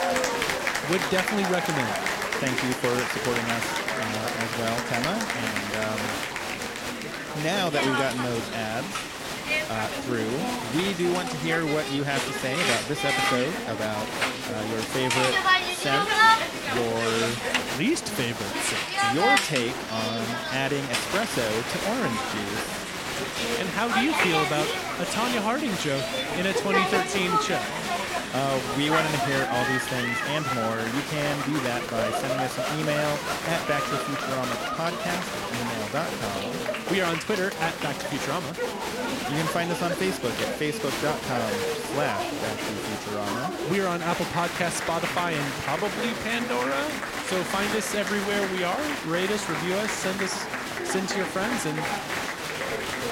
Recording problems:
crowd noise; very loud; throughout; 1 dB above the speech
chatter from many people; loud; throughout; 8 dB below the speech

